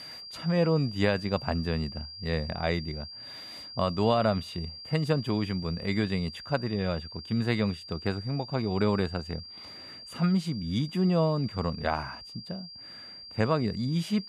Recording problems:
high-pitched whine; noticeable; throughout; 4.5 kHz, 10 dB below the speech

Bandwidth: 14.5 kHz